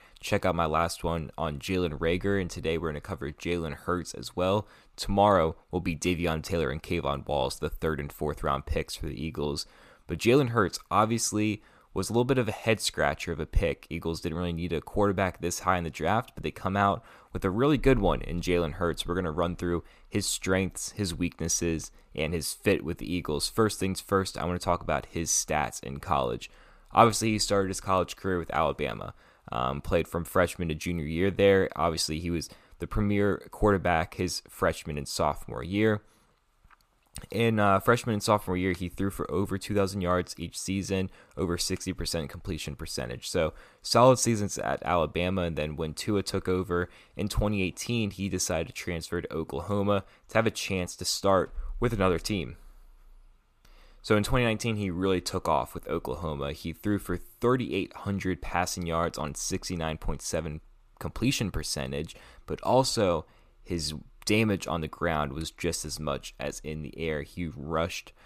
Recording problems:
none

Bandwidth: 14.5 kHz